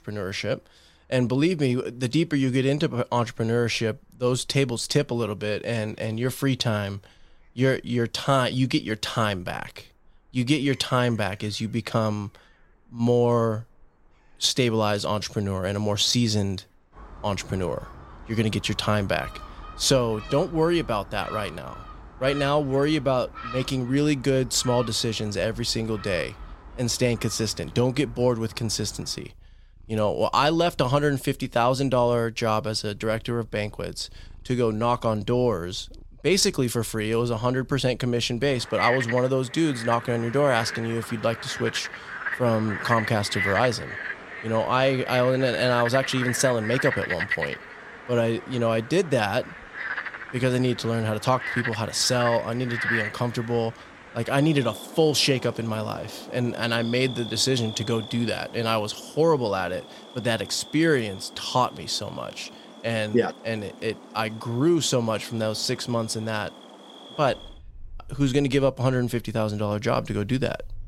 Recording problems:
animal sounds; noticeable; throughout; 10 dB below the speech

